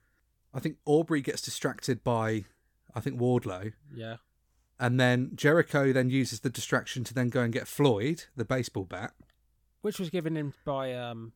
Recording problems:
none

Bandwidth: 17.5 kHz